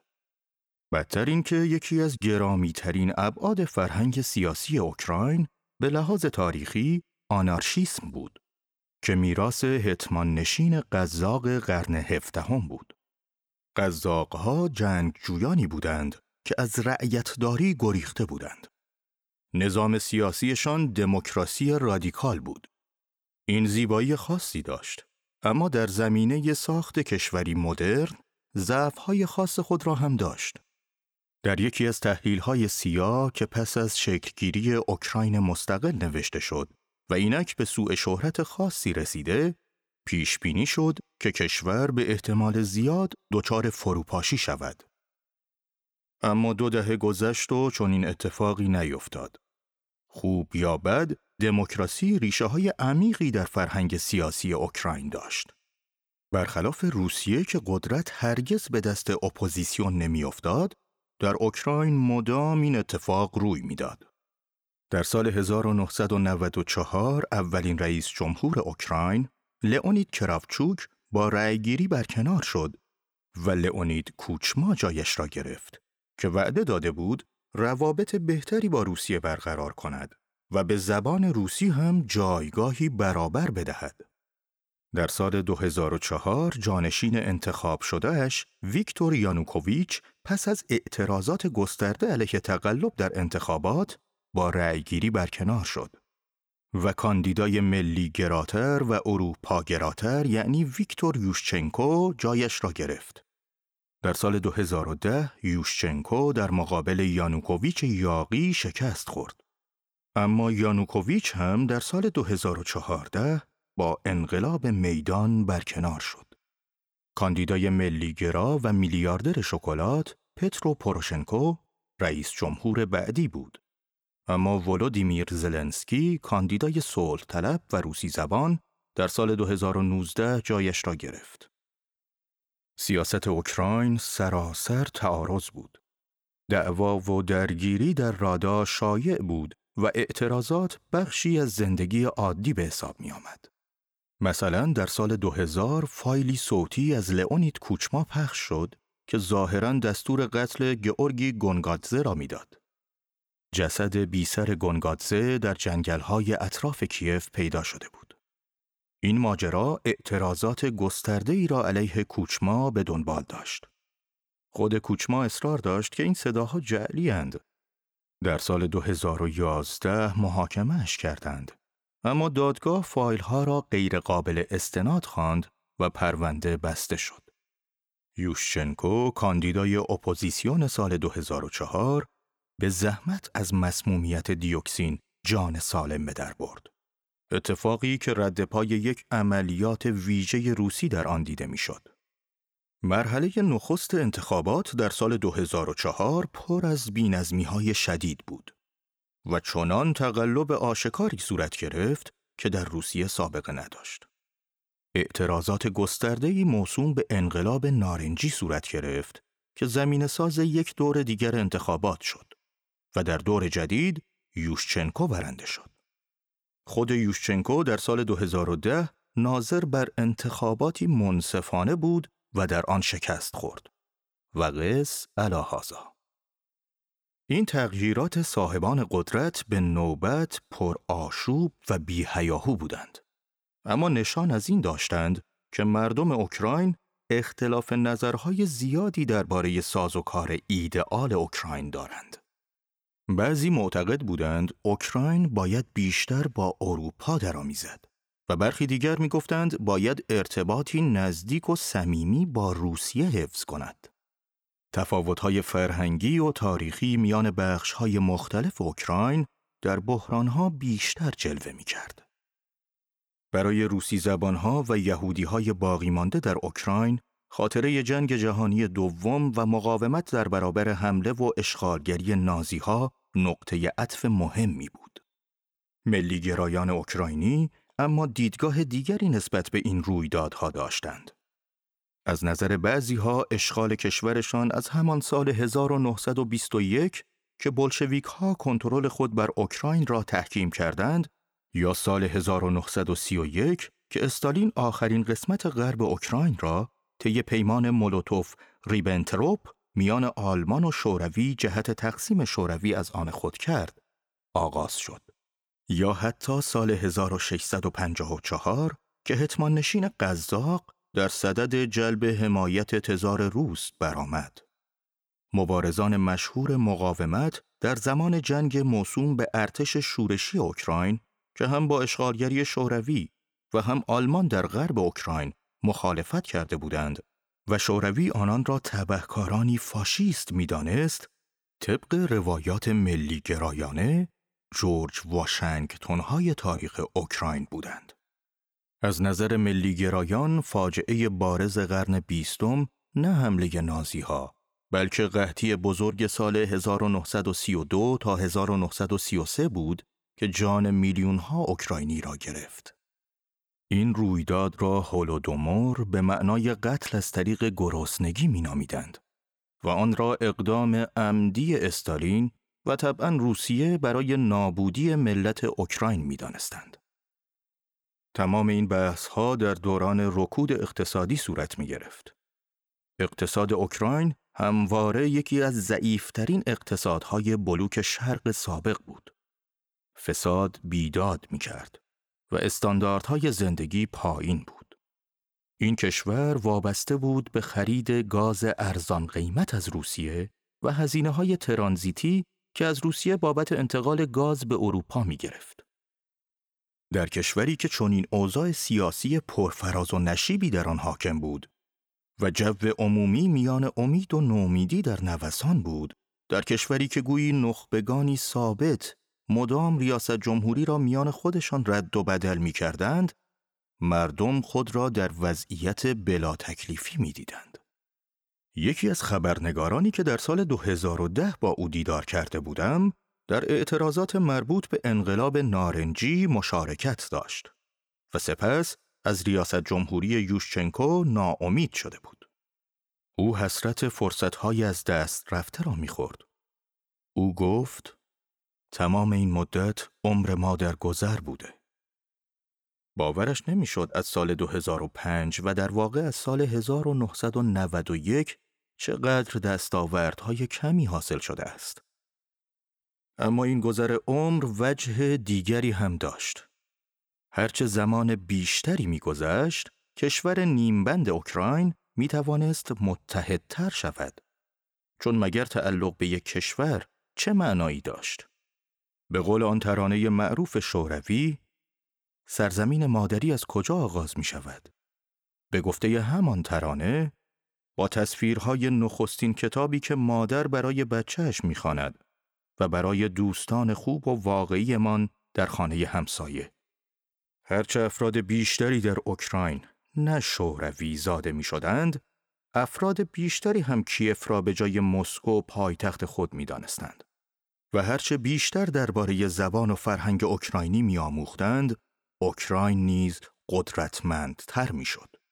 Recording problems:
none

